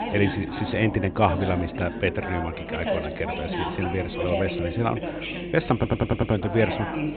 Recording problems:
high frequencies cut off; severe; nothing above 4 kHz
background chatter; loud; throughout; 4 voices, 5 dB below the speech
electrical hum; faint; throughout; 50 Hz, 25 dB below the speech
audio stuttering; at 6 s

